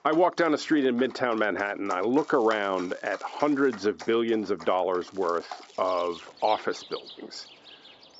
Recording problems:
high frequencies cut off; noticeable; nothing above 8 kHz
muffled; very slightly; fading above 2.5 kHz
thin; very slightly; fading below 400 Hz
animal sounds; noticeable; throughout; 20 dB below the speech
crackling; faint; from 2 to 4 s and from 5 to 6.5 s; 30 dB below the speech

